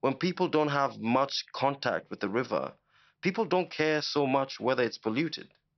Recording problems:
high frequencies cut off; noticeable; nothing above 5.5 kHz

